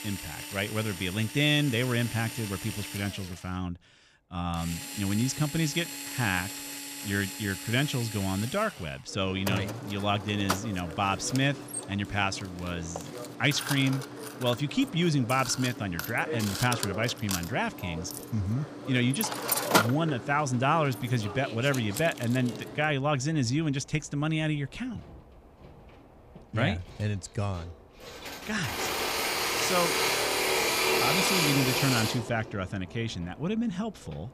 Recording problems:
machinery noise; loud; throughout; 2 dB below the speech

